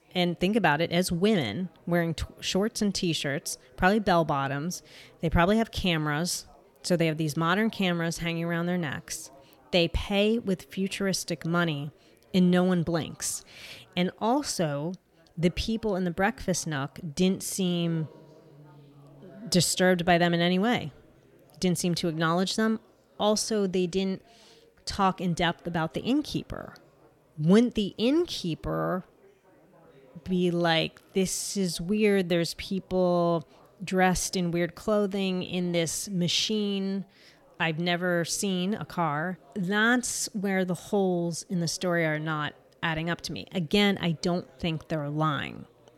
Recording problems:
chatter from many people; faint; throughout; 30 dB below the speech

